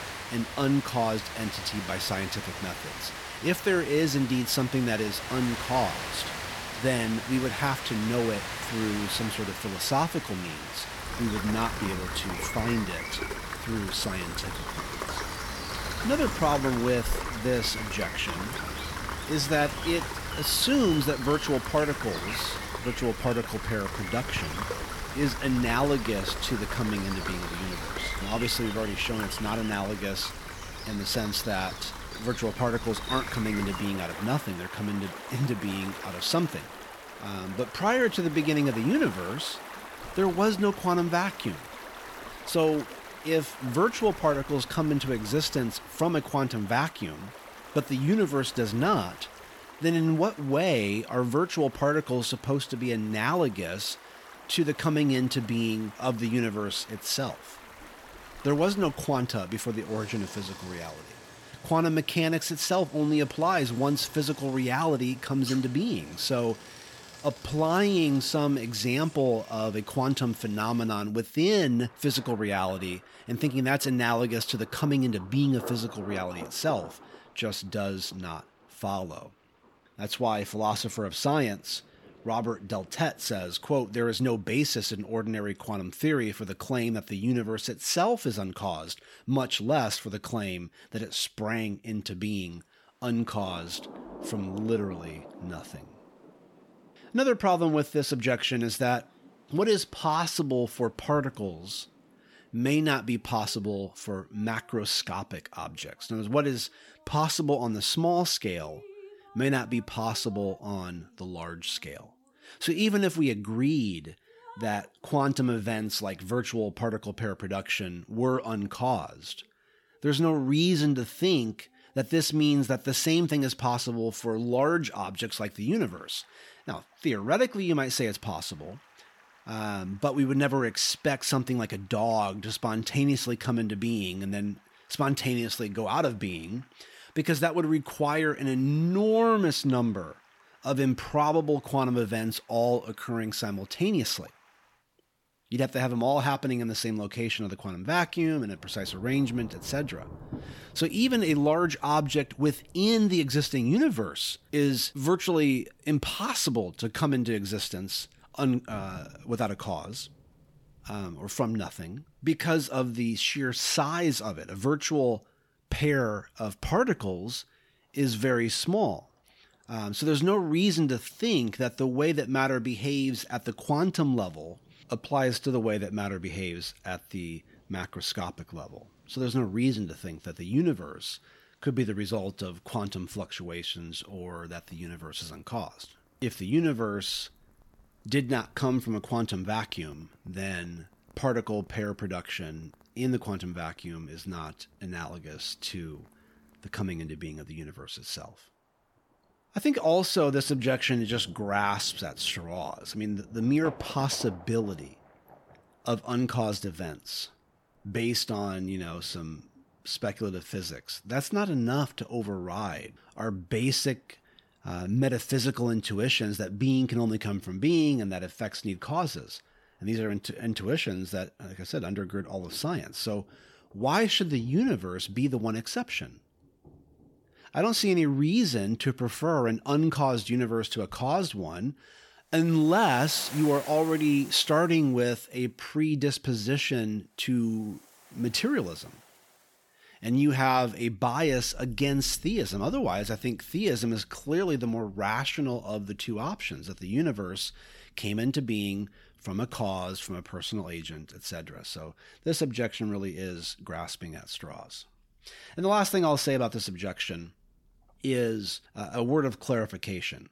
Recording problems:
rain or running water; loud; throughout; 10 dB below the speech

